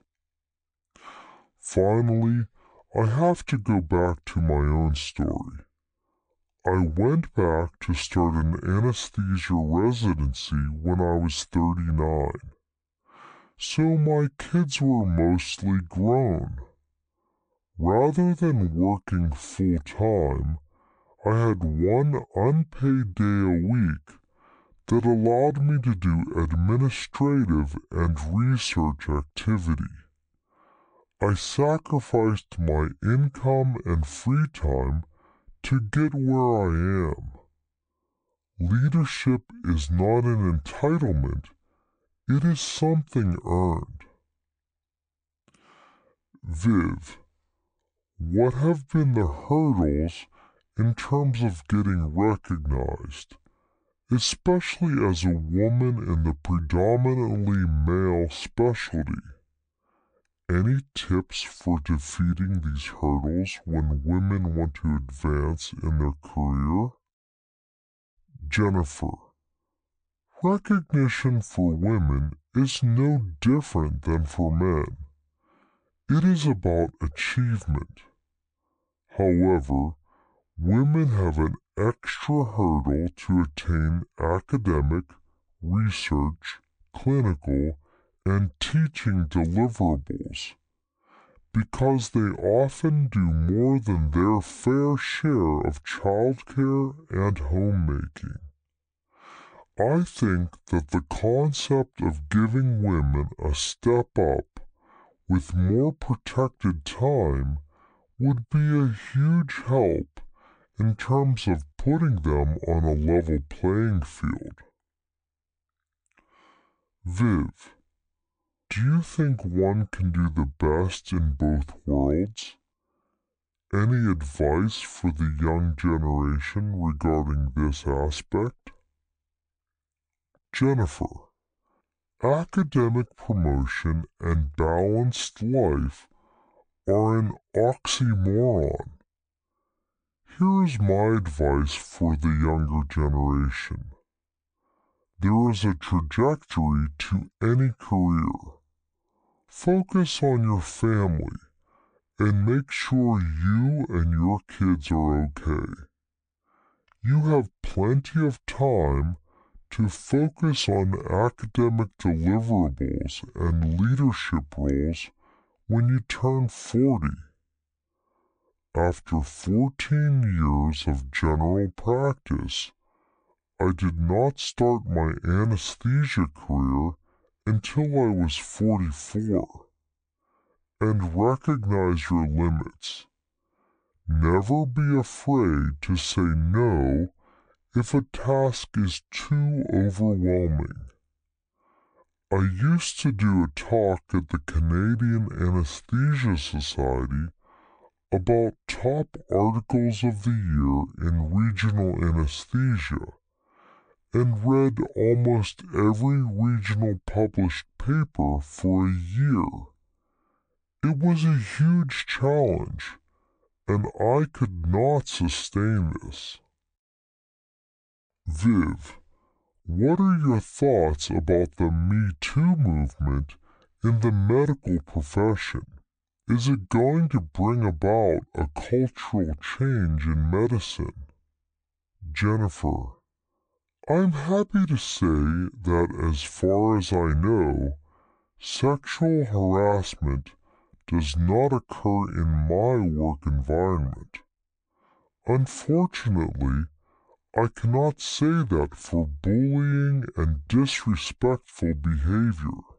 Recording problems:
wrong speed and pitch; too slow and too low; 0.6 times normal speed

